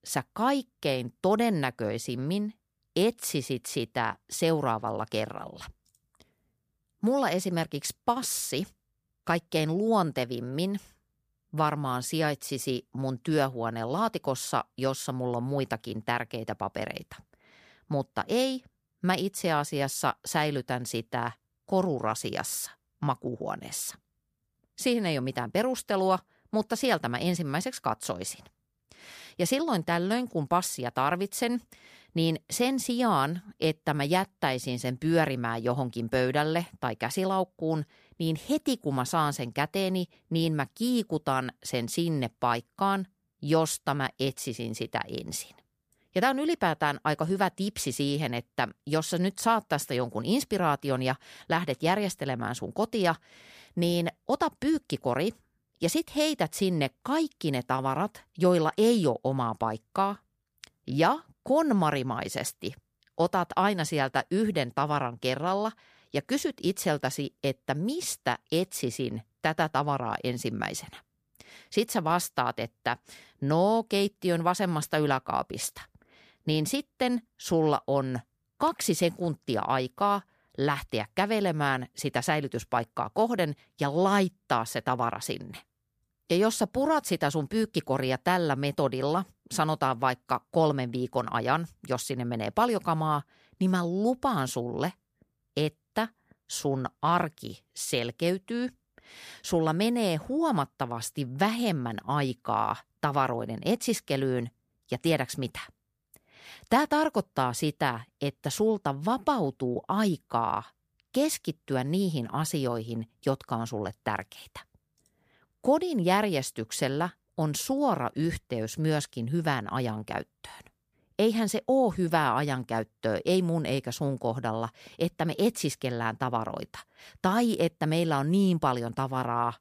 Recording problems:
none

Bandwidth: 15 kHz